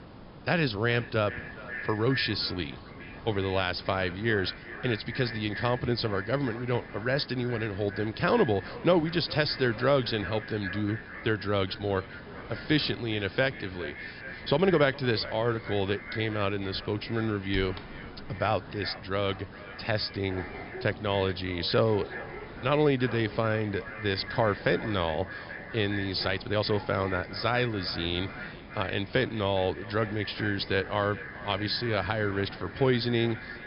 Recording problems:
echo of what is said; noticeable; throughout; 410 ms later, 15 dB below the speech
high frequencies cut off; noticeable; nothing above 5.5 kHz
hiss; noticeable; throughout; 20 dB below the speech
animal sounds; faint; throughout; 20 dB below the speech
uneven, jittery; strongly; from 14 to 32 s

